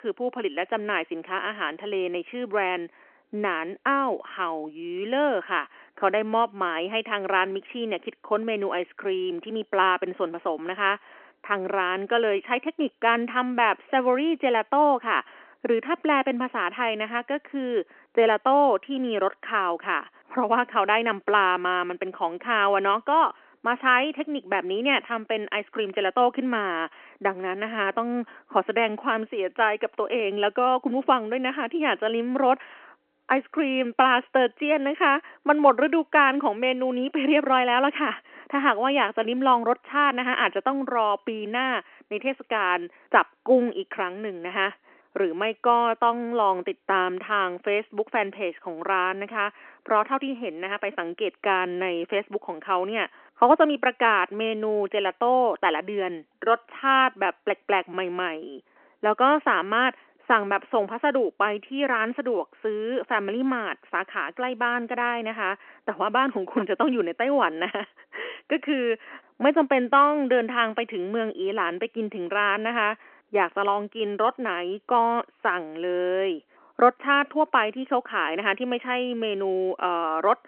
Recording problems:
phone-call audio; nothing above 3 kHz

